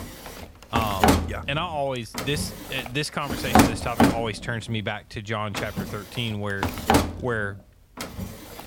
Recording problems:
household noises; very loud; throughout; 4 dB above the speech

